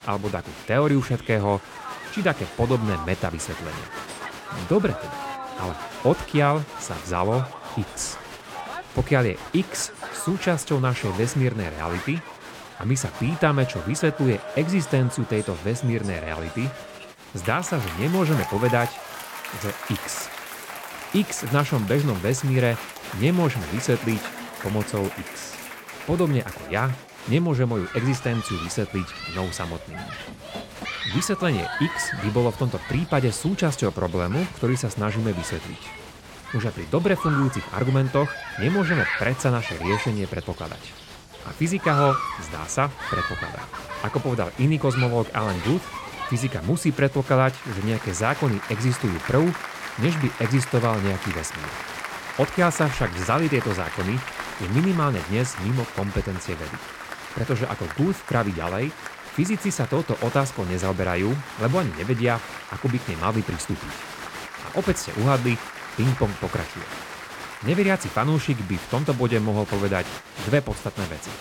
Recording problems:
crowd noise; loud; throughout; 9 dB below the speech

